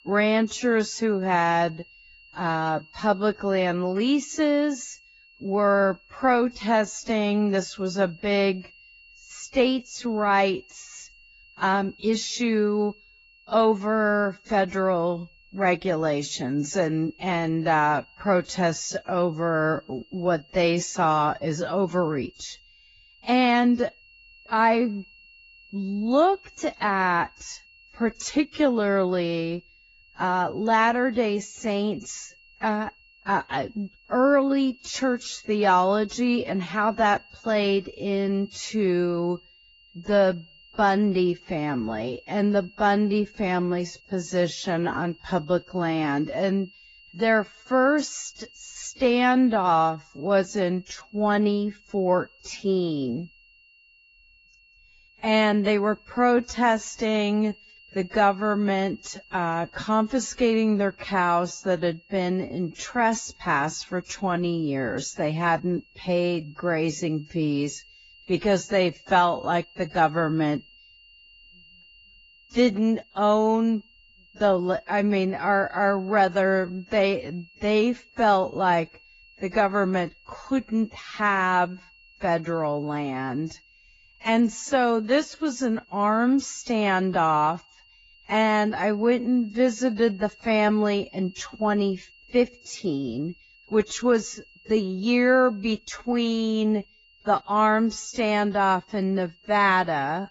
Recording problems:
garbled, watery; badly; nothing above 7.5 kHz
wrong speed, natural pitch; too slow; 0.6 times normal speed
high-pitched whine; faint; throughout; 3 kHz, 30 dB below the speech

